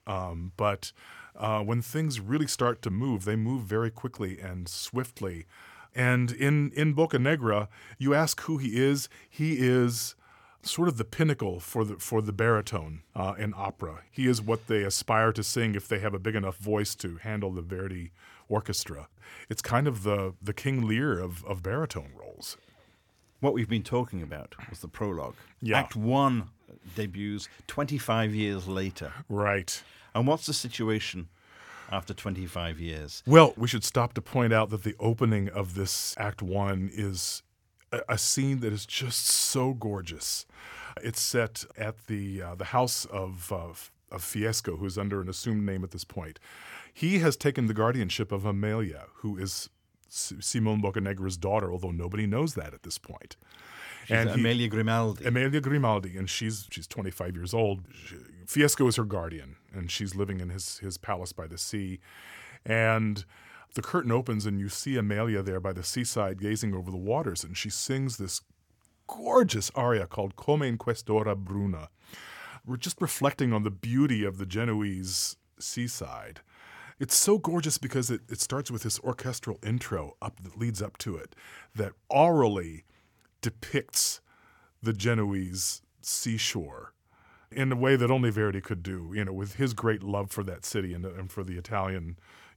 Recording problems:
none

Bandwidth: 17 kHz